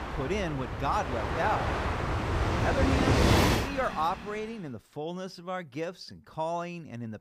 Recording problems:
train or aircraft noise; very loud; until 4 s; 5 dB above the speech

